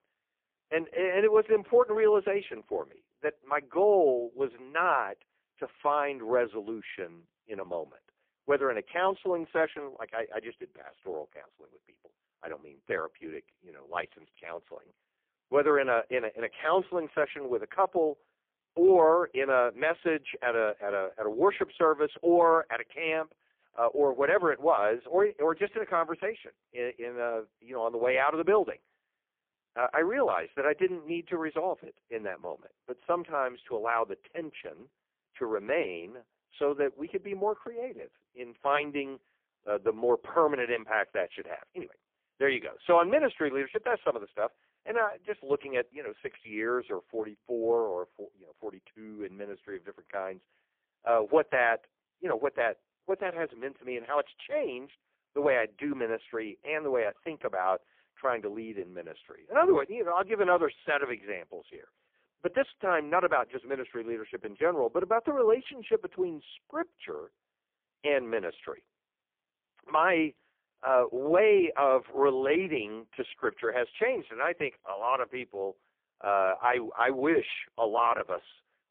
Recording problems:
phone-call audio; poor line; nothing above 3.5 kHz

